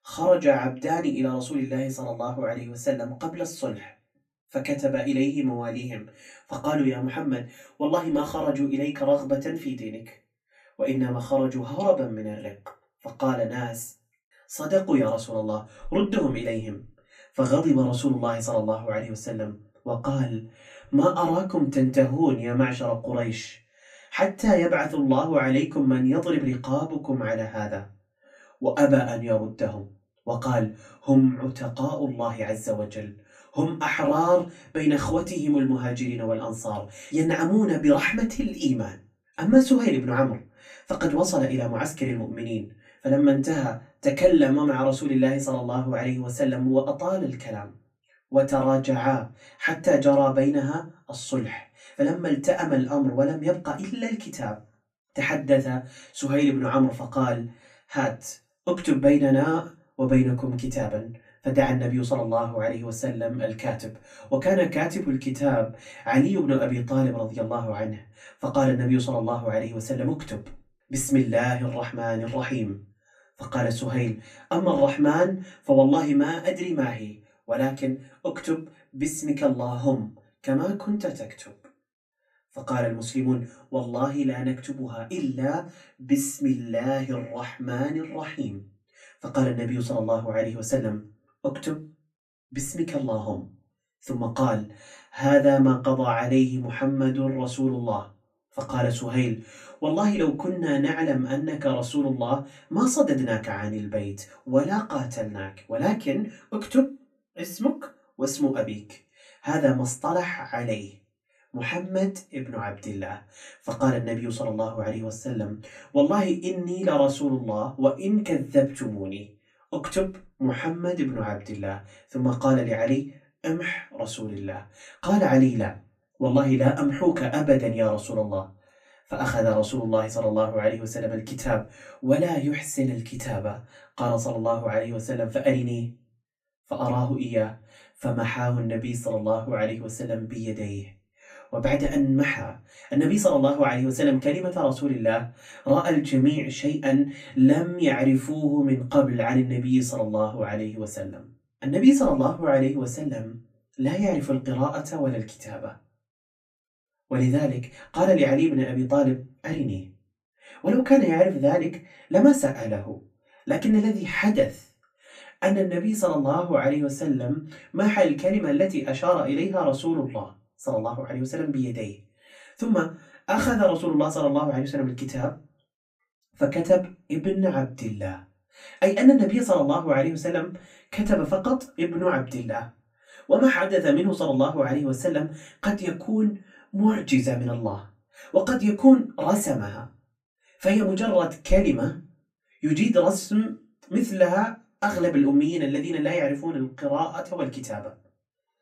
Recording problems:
off-mic speech; far
room echo; very slight; dies away in 0.2 s

